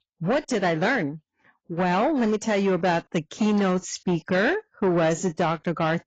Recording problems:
garbled, watery; badly; nothing above 7.5 kHz
distortion; slight; 10 dB below the speech

